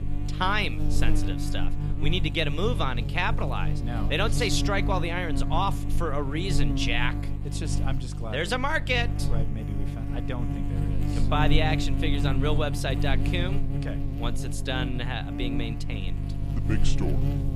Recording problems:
electrical hum; loud; throughout; 50 Hz, 9 dB below the speech

